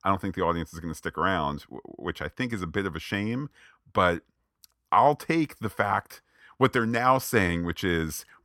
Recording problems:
none

